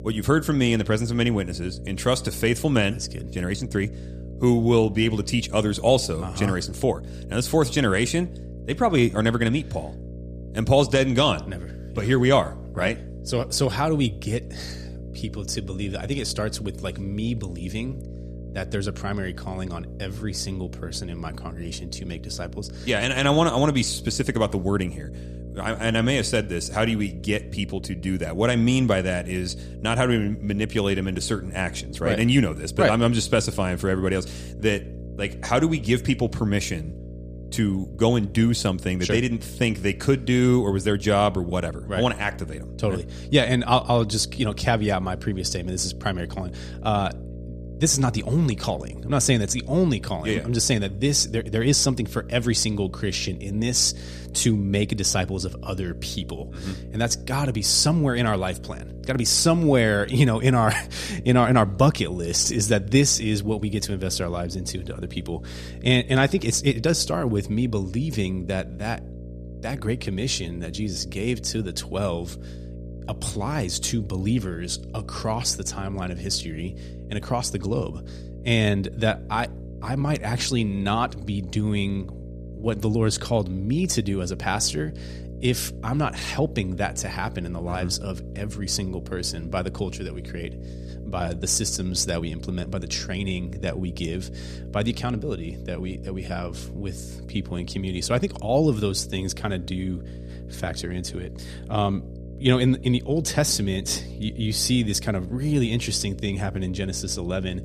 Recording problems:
electrical hum; noticeable; throughout; 60 Hz, 20 dB below the speech

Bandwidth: 14.5 kHz